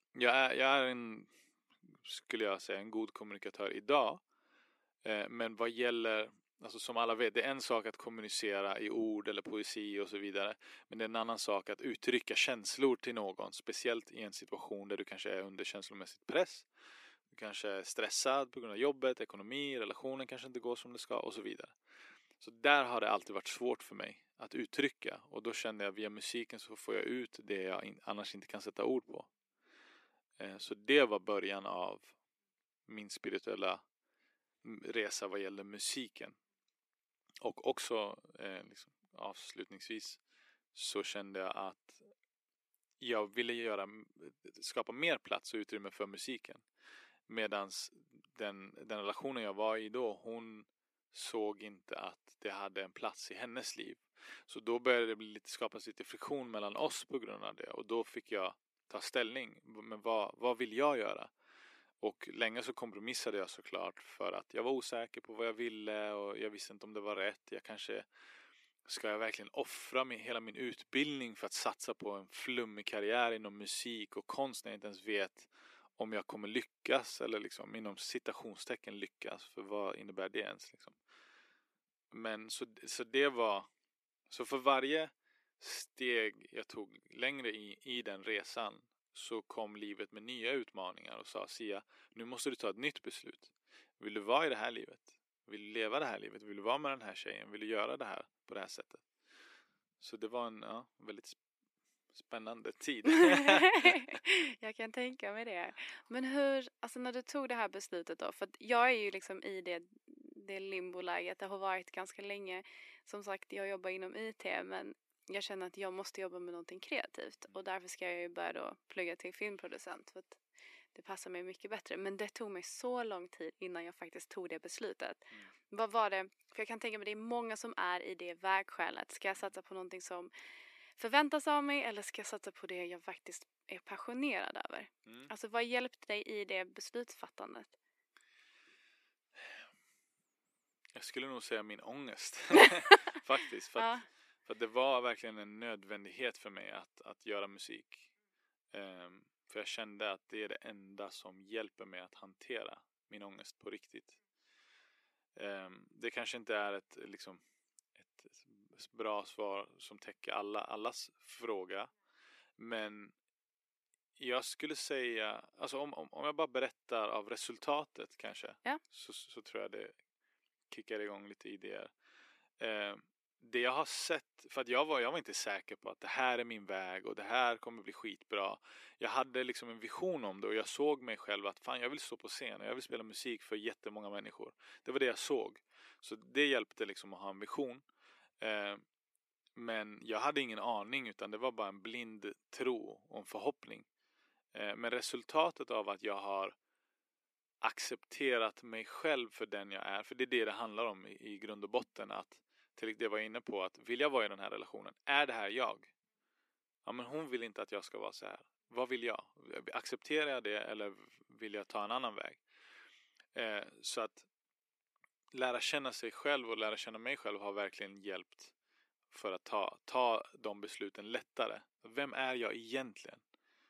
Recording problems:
thin; somewhat; fading below 300 Hz

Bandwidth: 14.5 kHz